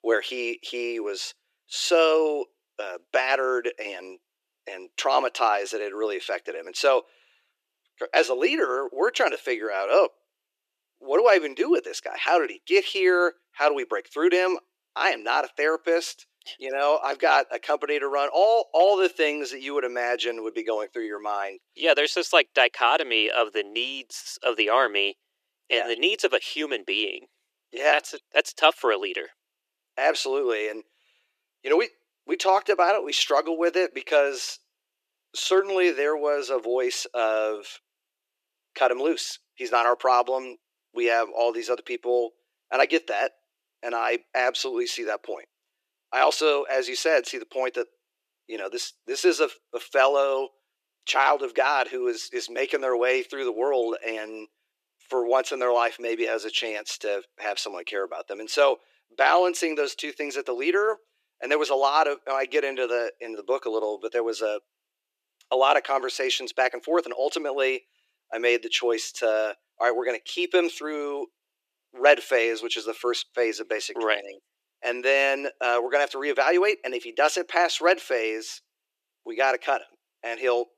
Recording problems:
thin; very; fading below 350 Hz

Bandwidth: 14.5 kHz